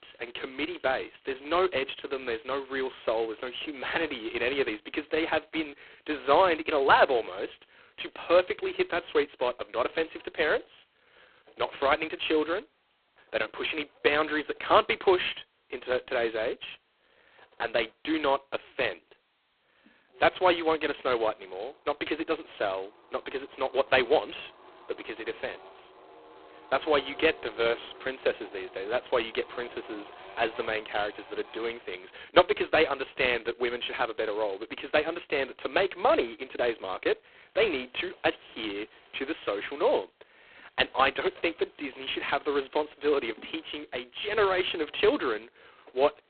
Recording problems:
phone-call audio; poor line; nothing above 4 kHz
traffic noise; faint; throughout; 25 dB below the speech

